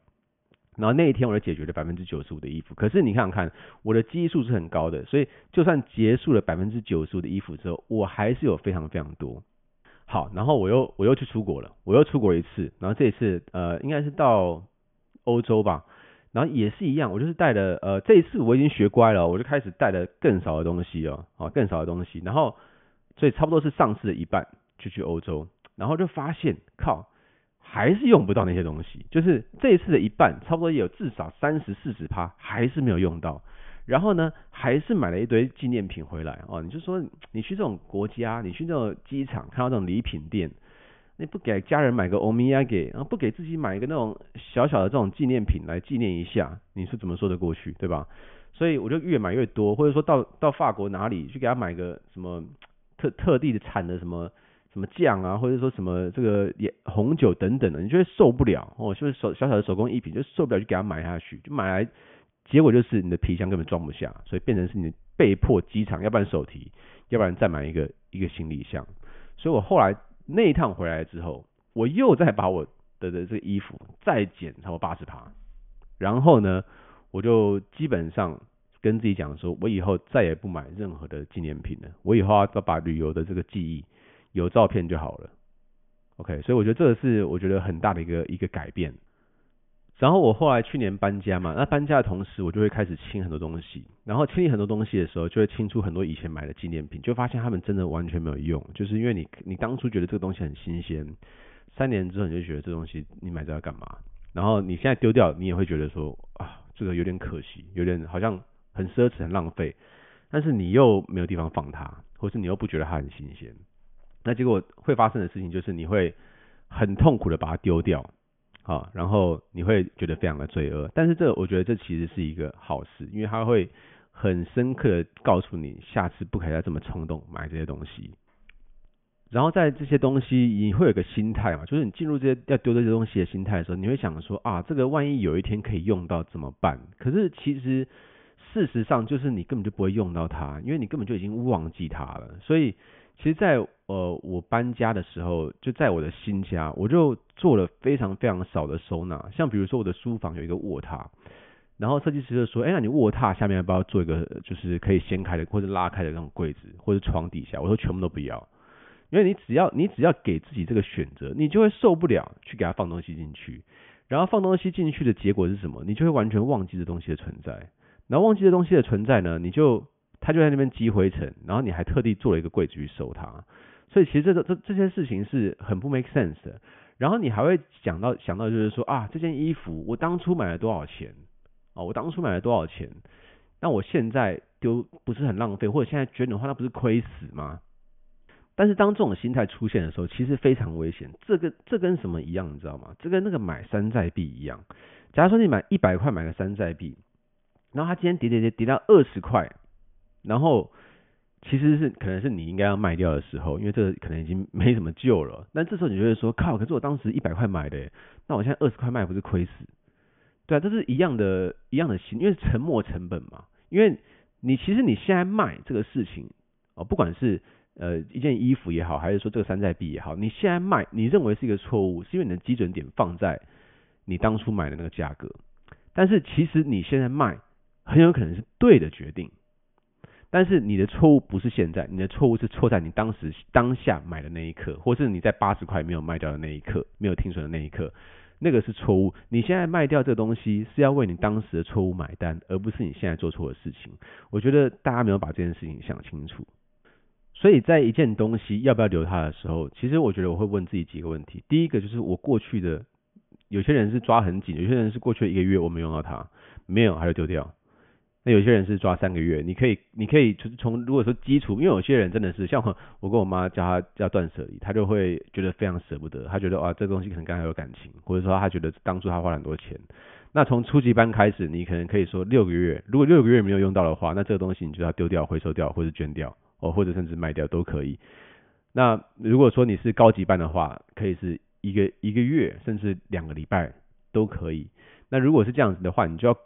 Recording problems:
high frequencies cut off; severe; nothing above 3.5 kHz

